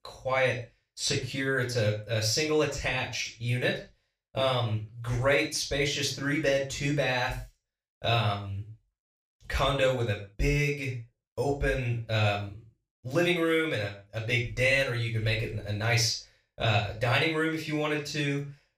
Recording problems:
off-mic speech; far
room echo; noticeable; dies away in 0.3 s

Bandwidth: 15 kHz